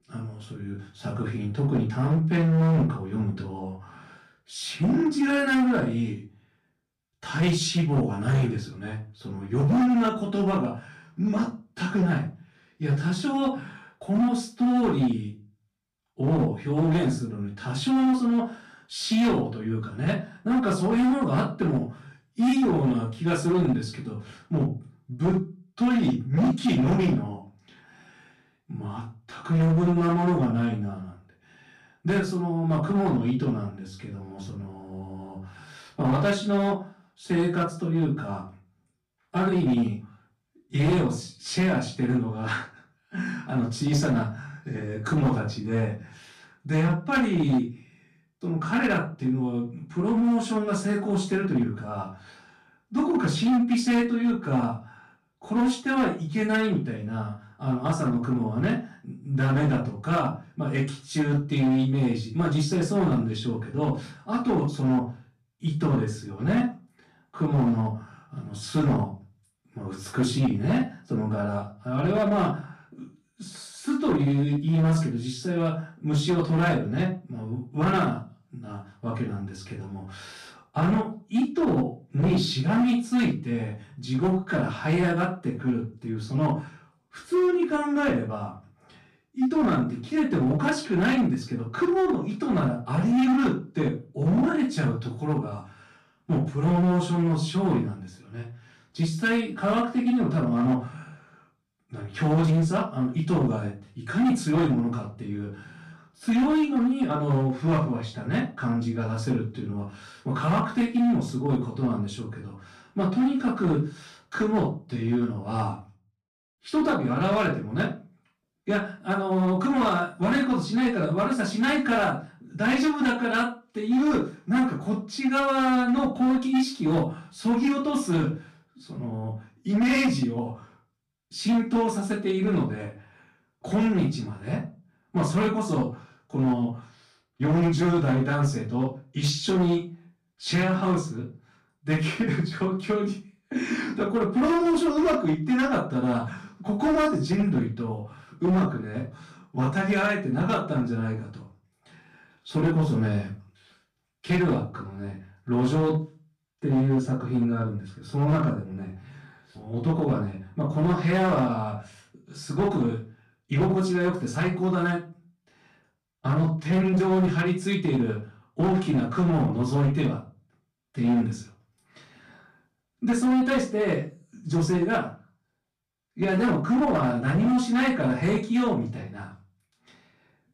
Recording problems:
off-mic speech; far
room echo; slight; dies away in 0.3 s
distortion; slight; 8% of the sound clipped

